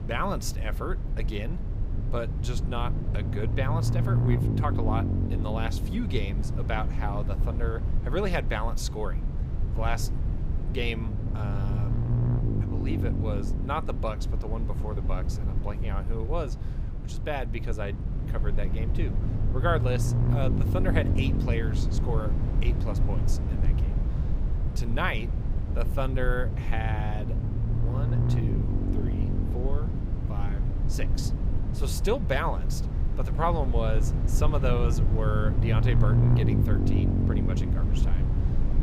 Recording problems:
low rumble; loud; throughout; 6 dB below the speech

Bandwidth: 15.5 kHz